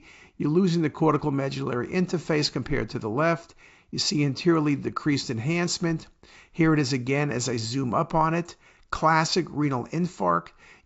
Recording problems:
high frequencies cut off; noticeable; nothing above 8 kHz

